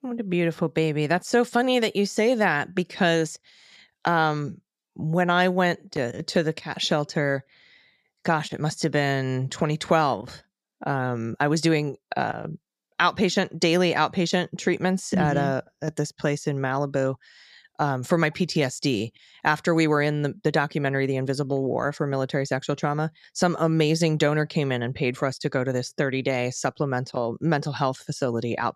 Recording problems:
none

